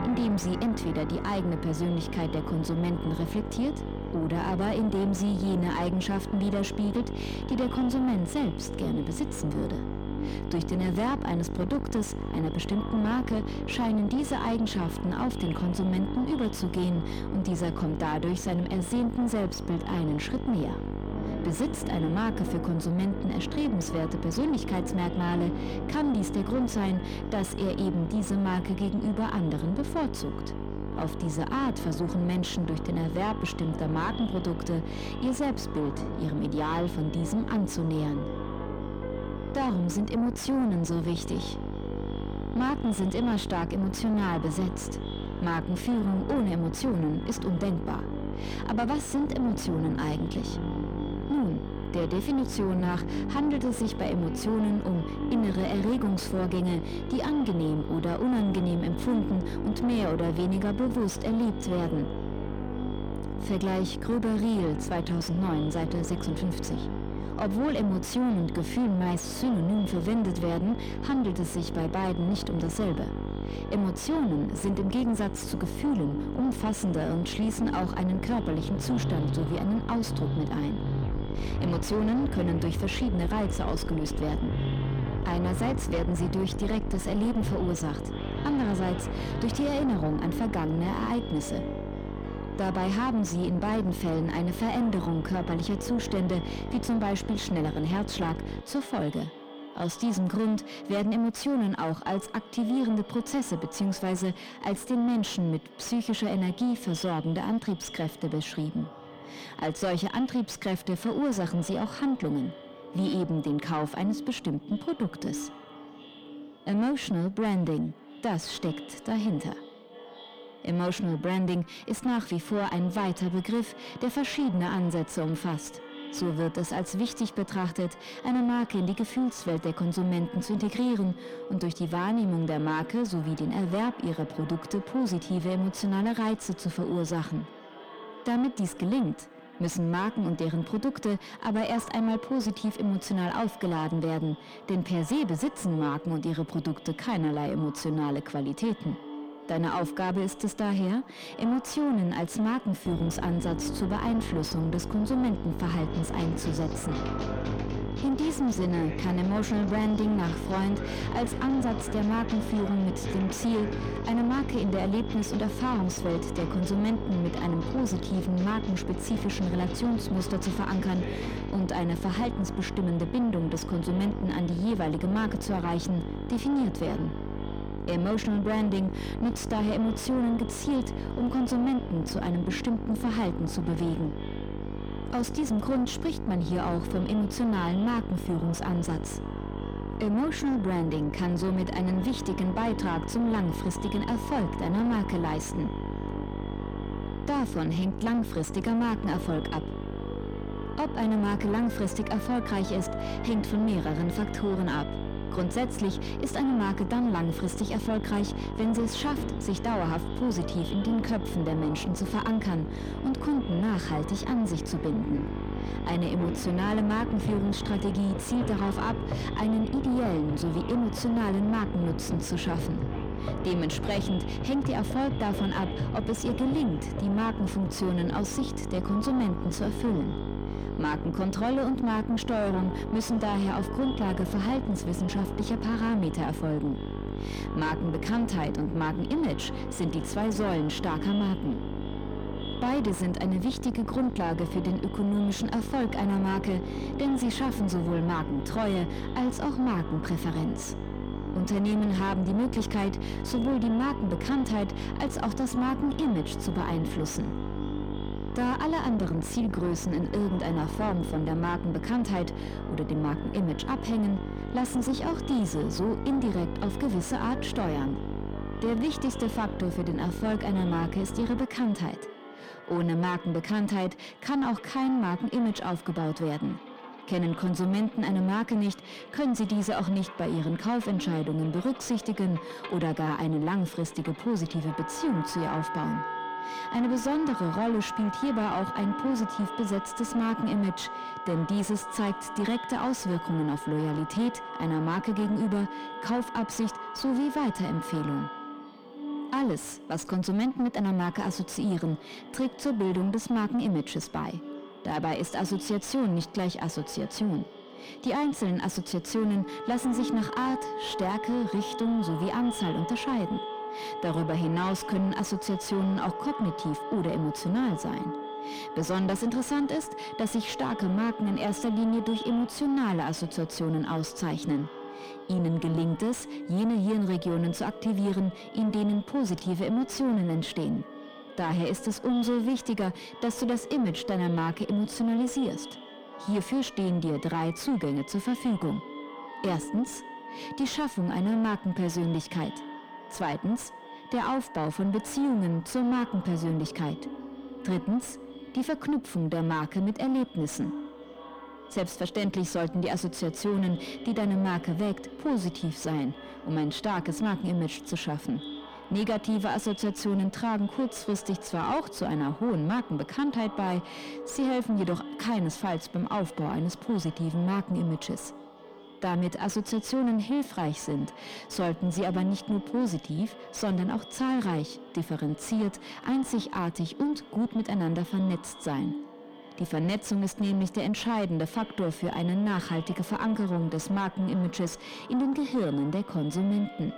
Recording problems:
echo of what is said; noticeable; throughout; 540 ms later, 15 dB below the speech
distortion; slight; 10 dB below the speech
electrical hum; loud; until 1:39 and from 2:33 to 4:31; 50 Hz, 7 dB below the speech
background music; noticeable; throughout; 10 dB below the speech

